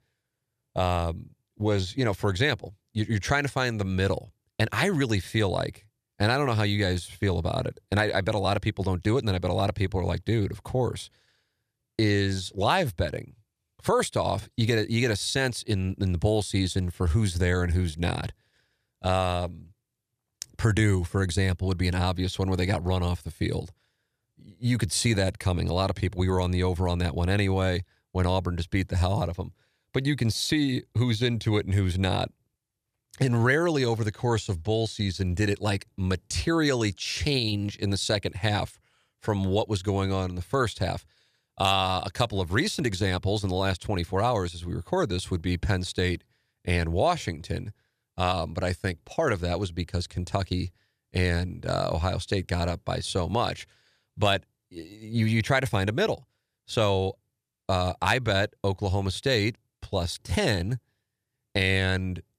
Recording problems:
none

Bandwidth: 14.5 kHz